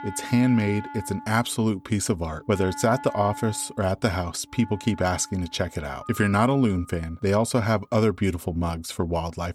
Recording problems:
background music; noticeable; throughout; 15 dB below the speech

